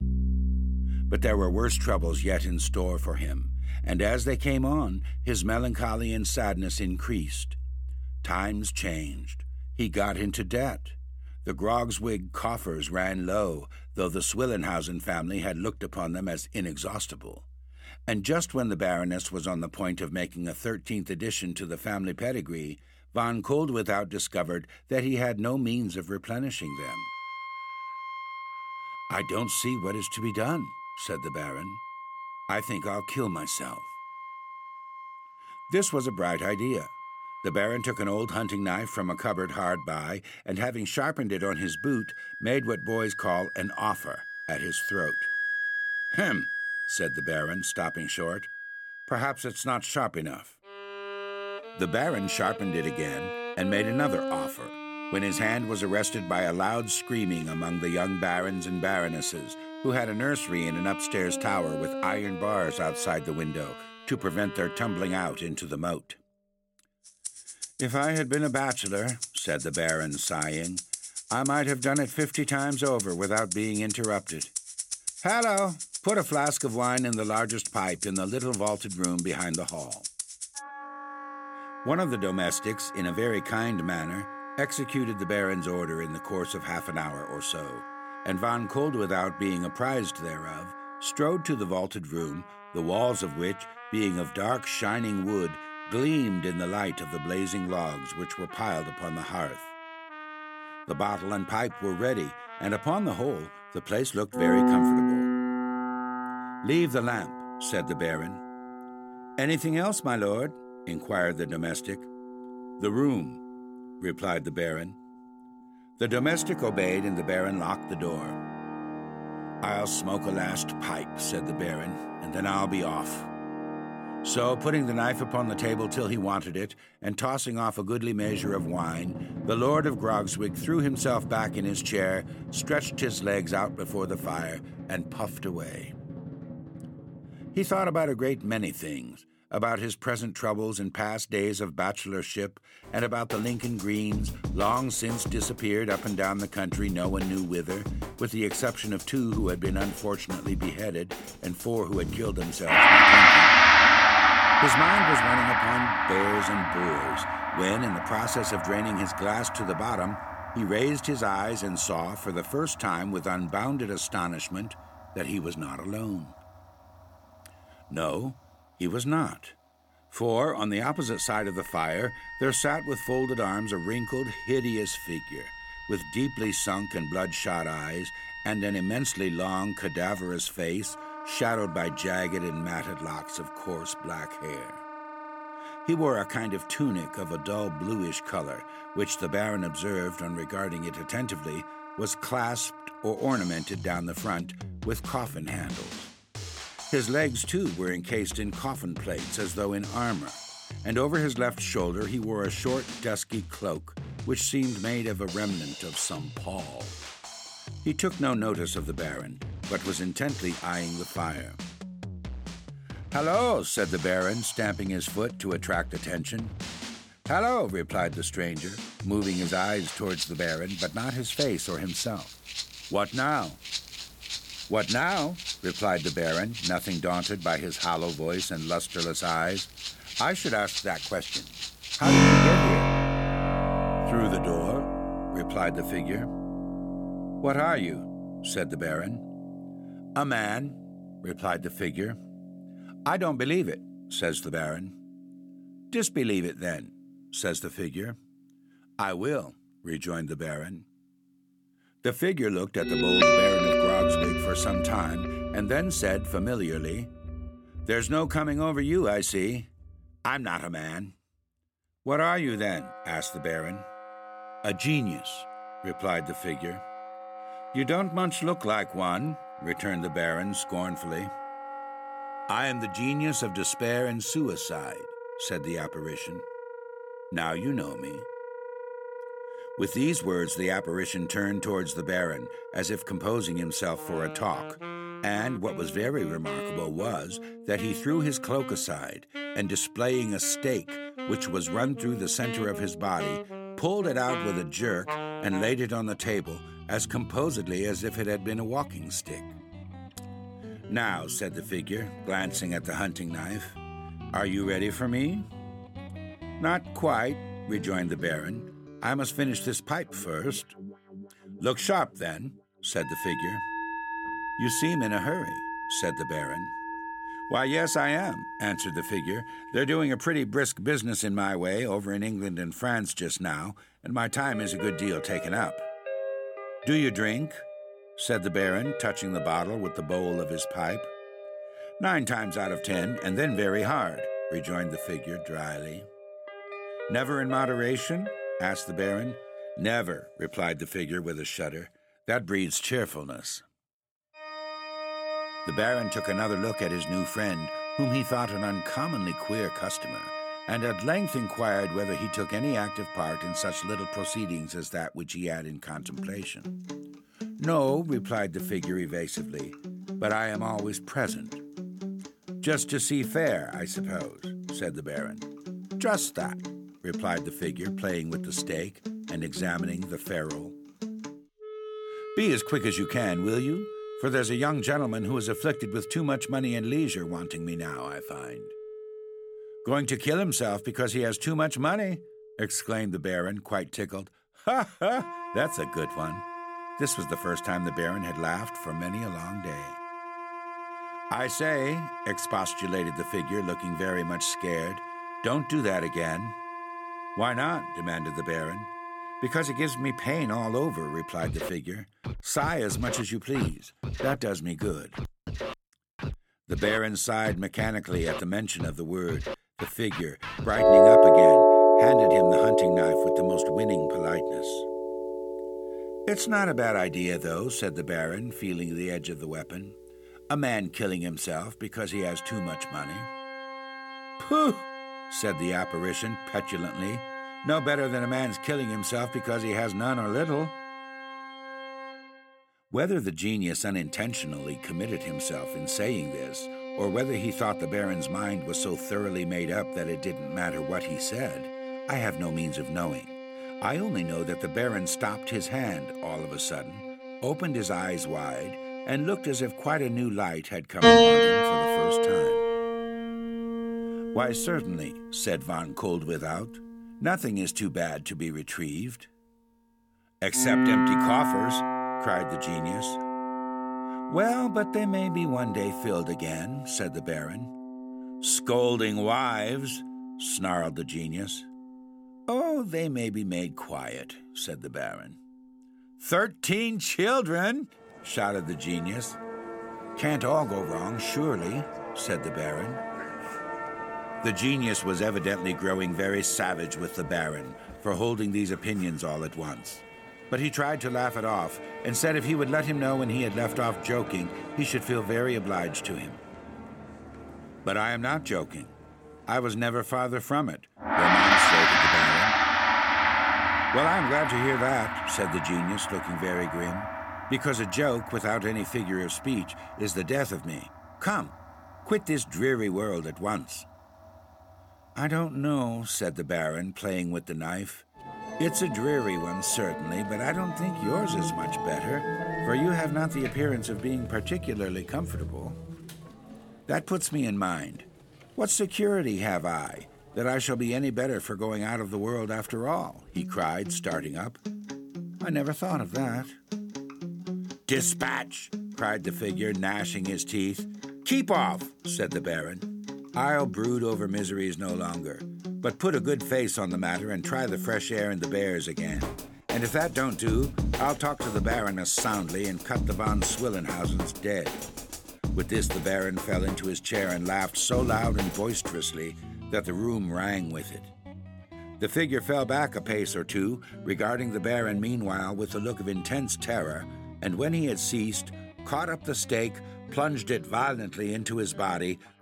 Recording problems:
background music; loud; throughout; 1 dB below the speech

